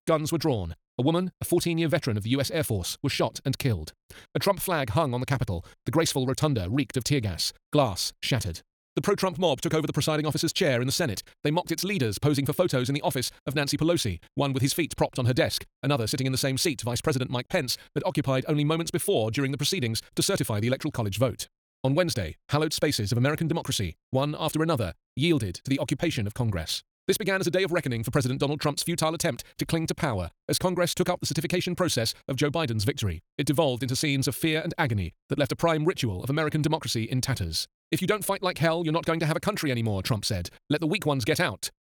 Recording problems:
wrong speed, natural pitch; too fast; 1.6 times normal speed

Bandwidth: 18.5 kHz